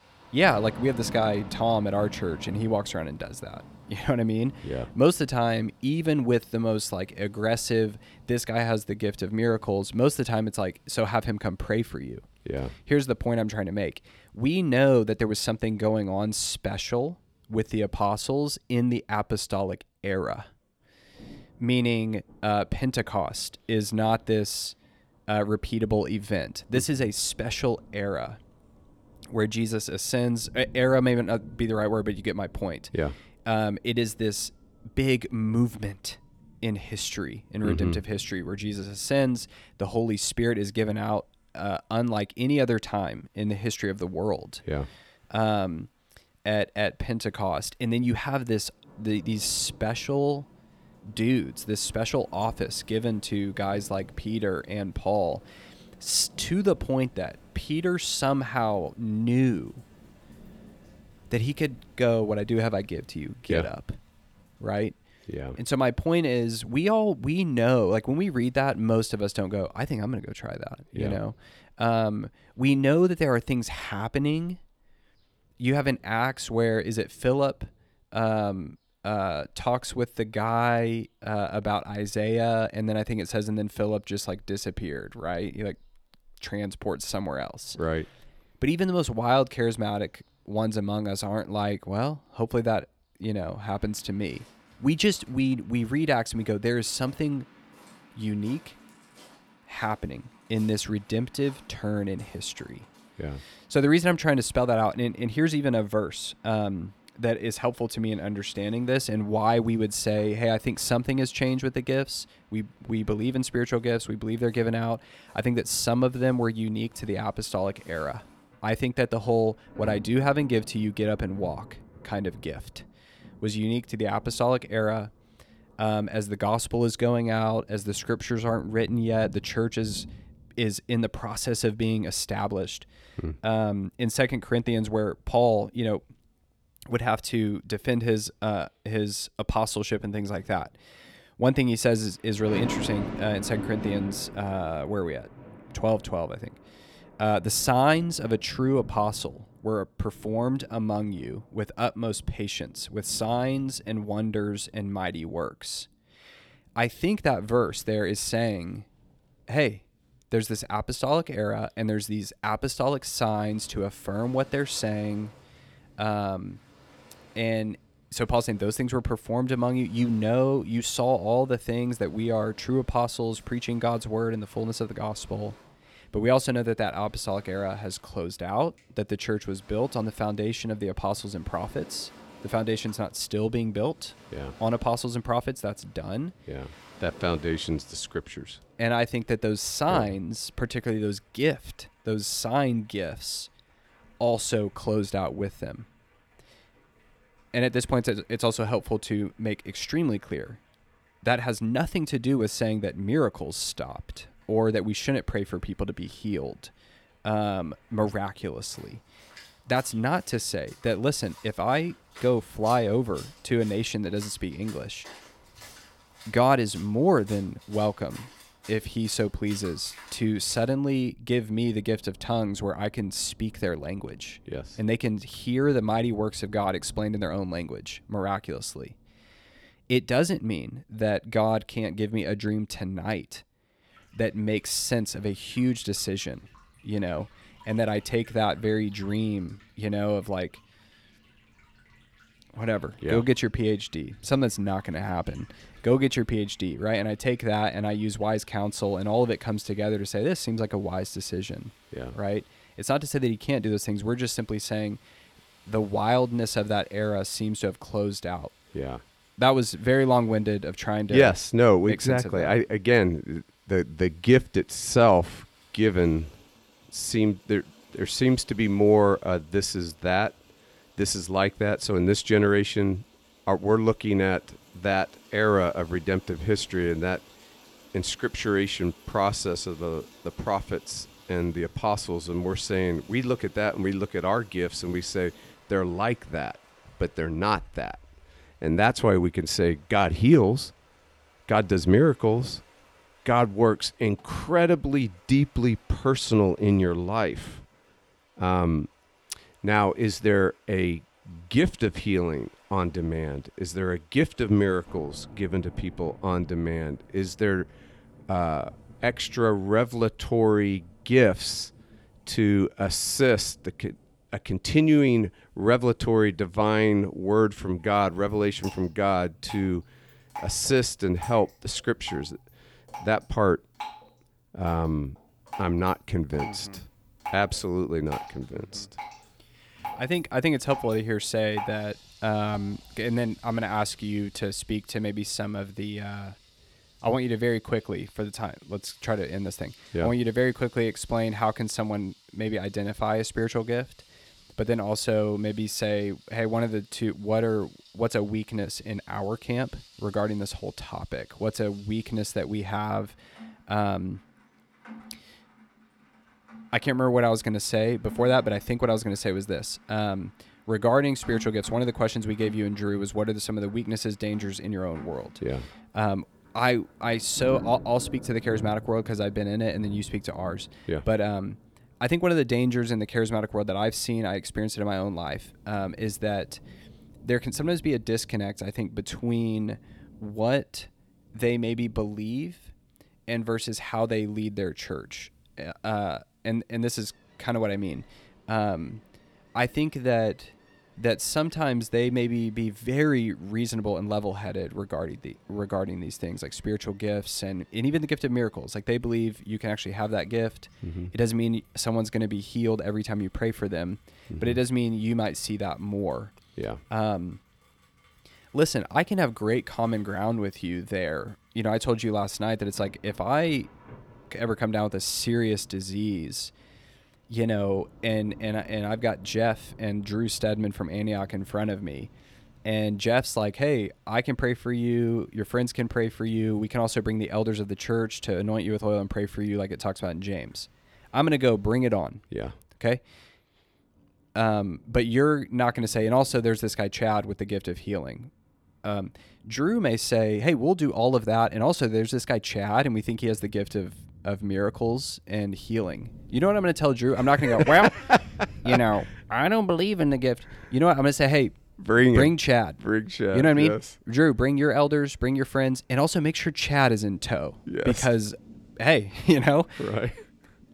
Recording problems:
rain or running water; faint; throughout; 20 dB below the speech

